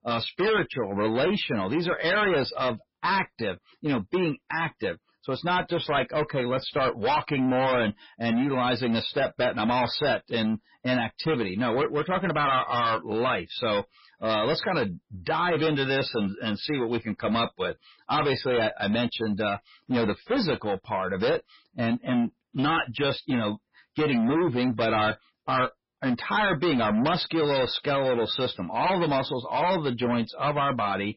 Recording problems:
distortion; heavy; 19% of the sound clipped
garbled, watery; badly; nothing above 5.5 kHz

